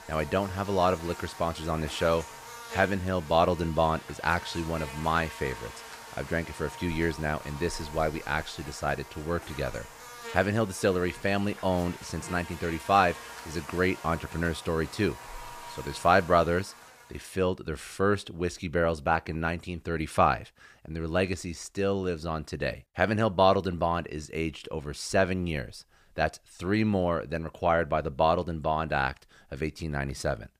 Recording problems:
animal sounds; noticeable; until 17 s; 15 dB below the speech

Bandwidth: 15 kHz